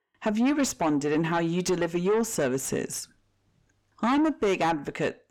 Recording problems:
distortion; slight; 10 dB below the speech

